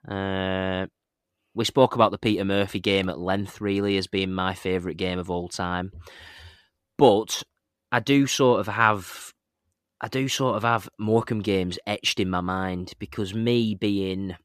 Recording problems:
none

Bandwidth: 14.5 kHz